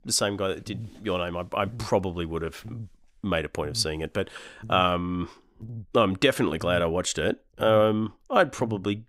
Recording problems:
electrical hum; faint; throughout; 50 Hz, 25 dB below the speech

